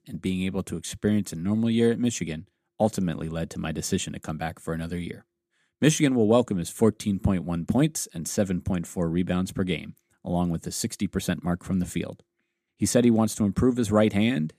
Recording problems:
none

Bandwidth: 14.5 kHz